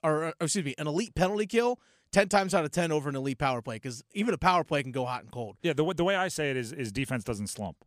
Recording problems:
none

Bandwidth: 14.5 kHz